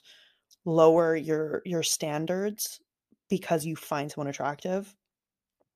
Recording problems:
none

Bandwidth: 14.5 kHz